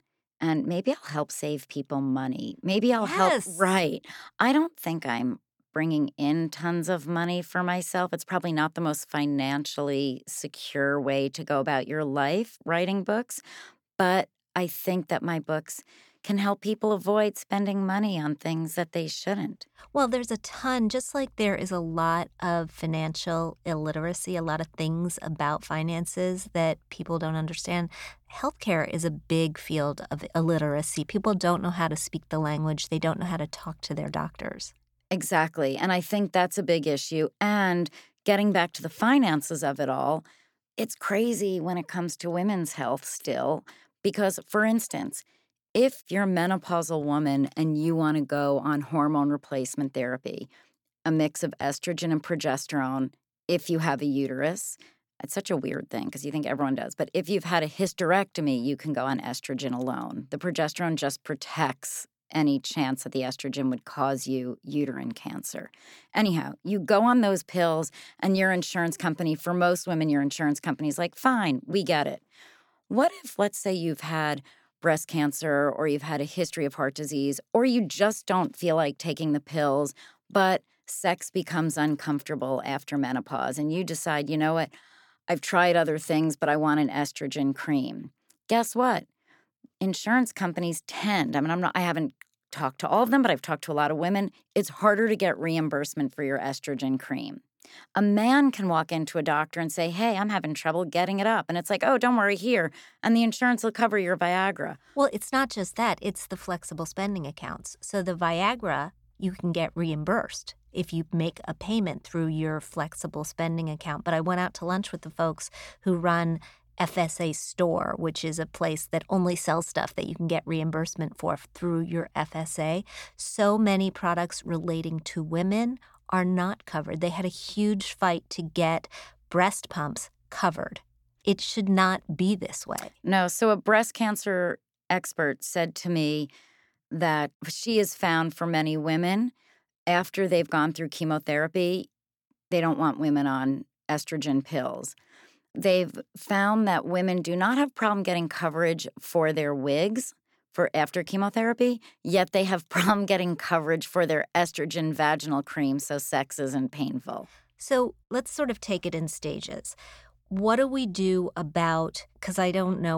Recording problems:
abrupt cut into speech; at the end

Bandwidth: 18 kHz